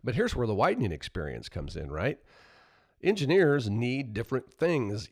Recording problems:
none

